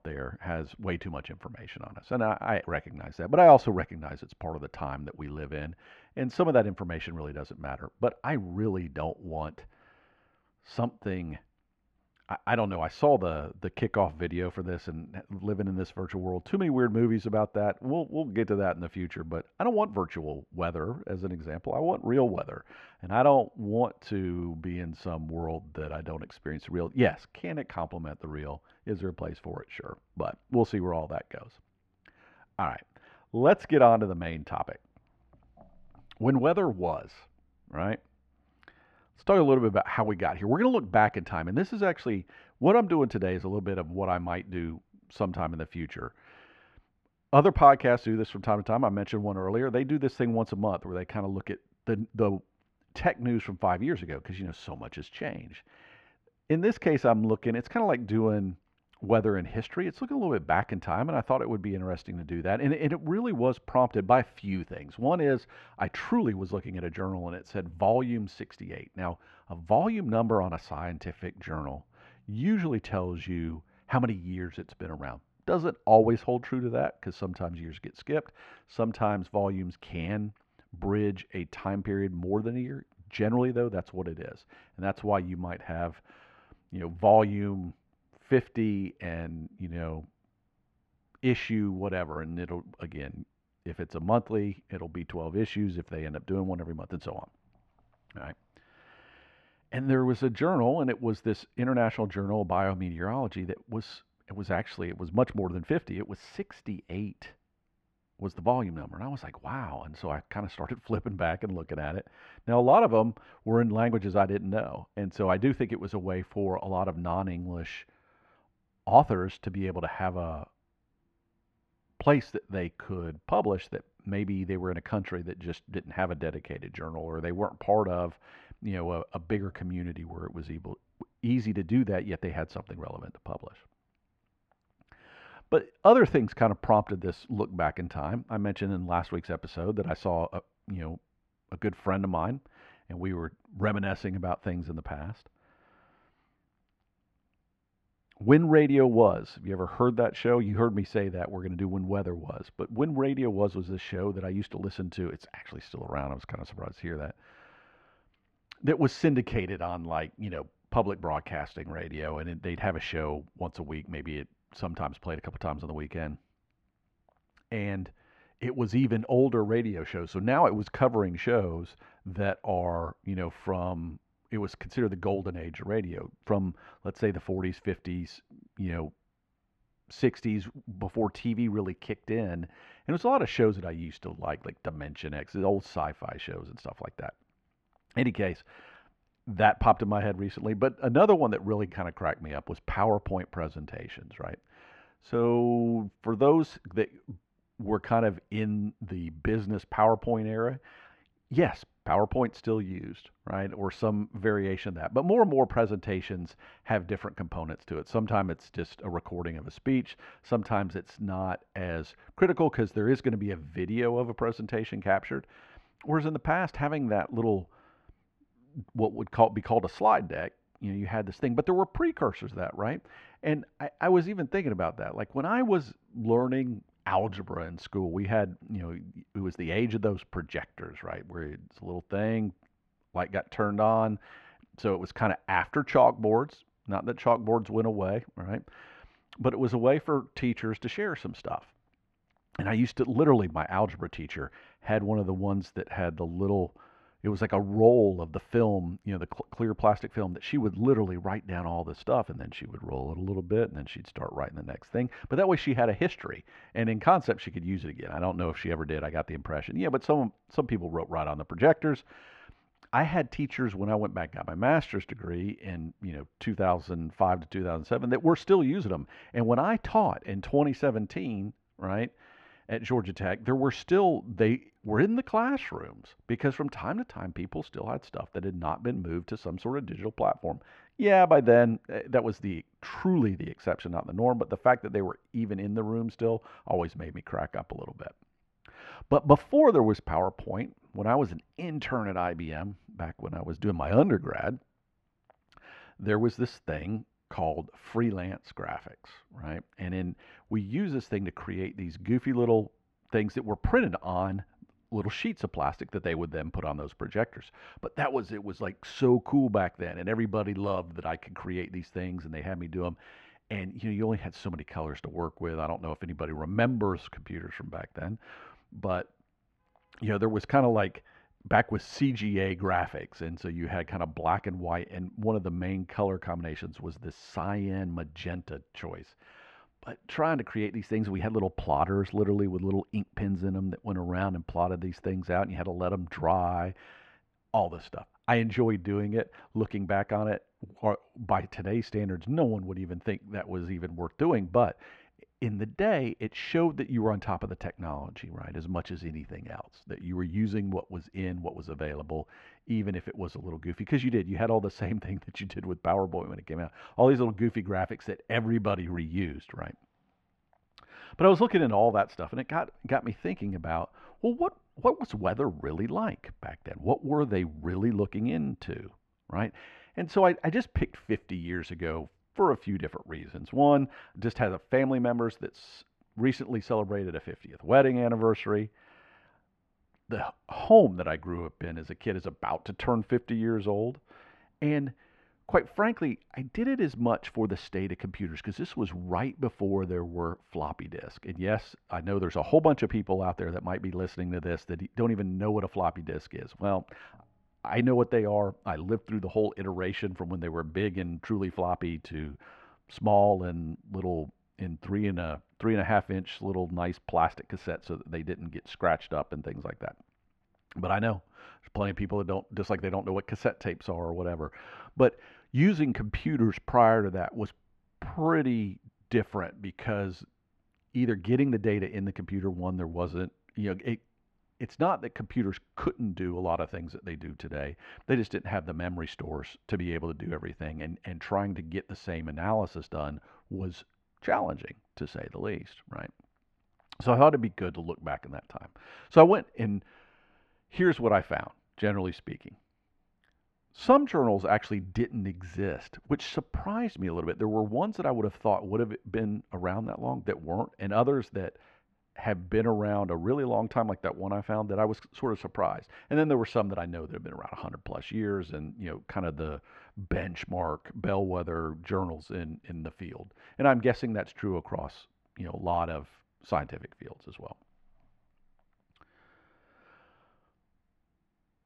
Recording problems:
muffled; very; fading above 1.5 kHz

